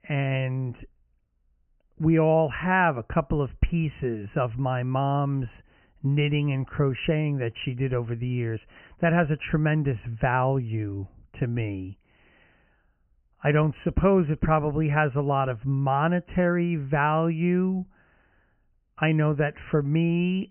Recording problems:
high frequencies cut off; severe; nothing above 3 kHz

